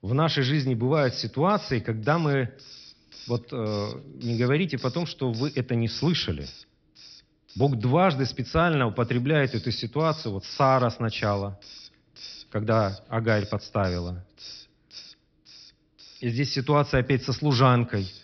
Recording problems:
high frequencies cut off; noticeable; nothing above 5.5 kHz
hiss; noticeable; throughout; 20 dB below the speech

